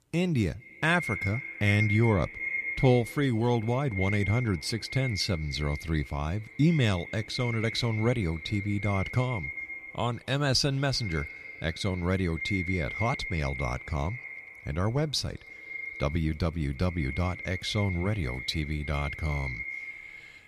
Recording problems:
echo of what is said; strong; throughout; 230 ms later, 7 dB below the speech

